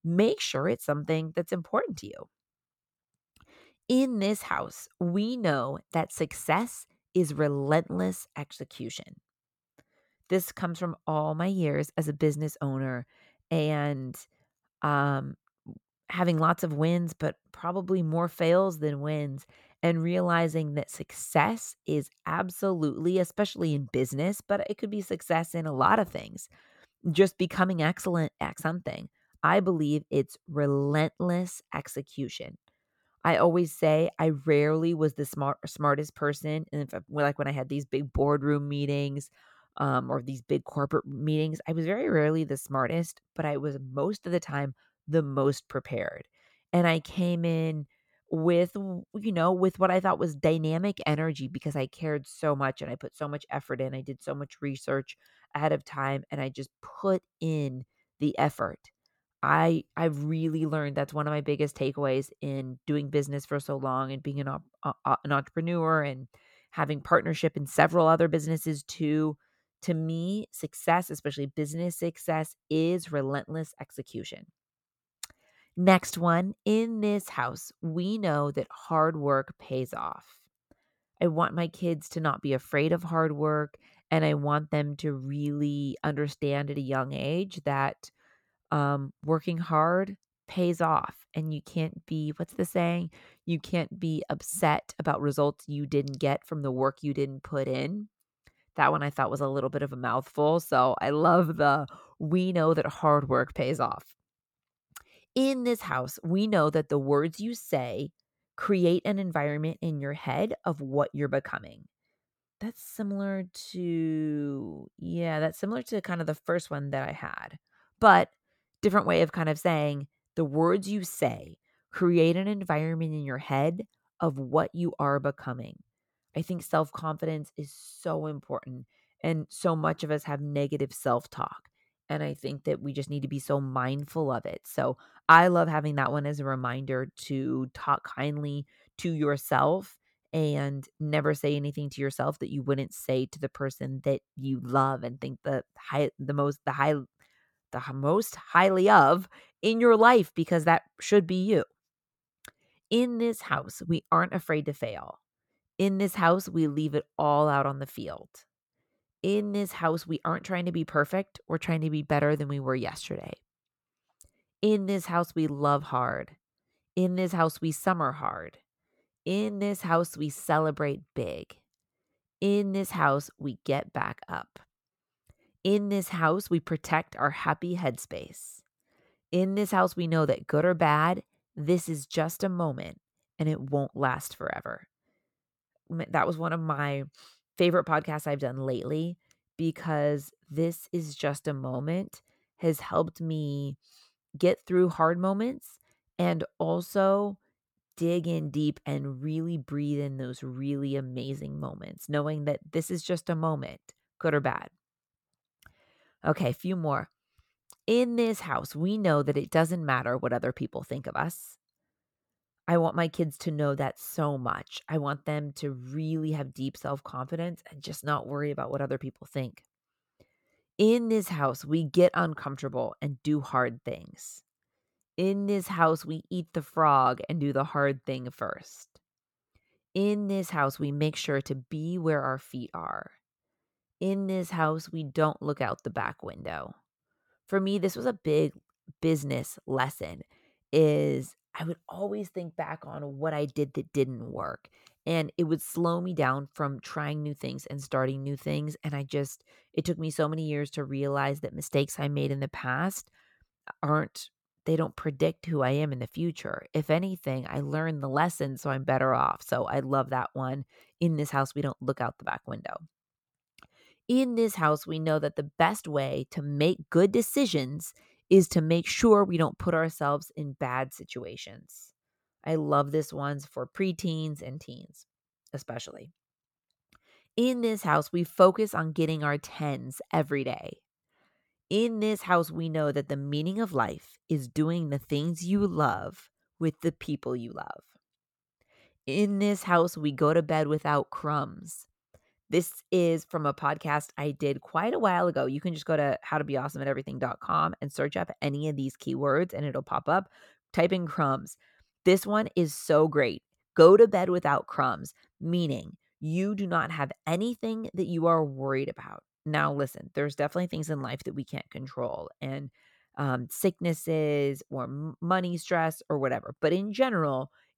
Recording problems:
none

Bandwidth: 17.5 kHz